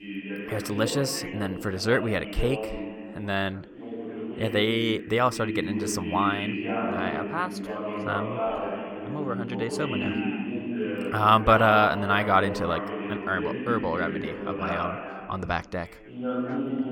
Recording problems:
background chatter; loud; throughout; 2 voices, 5 dB below the speech

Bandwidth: 18 kHz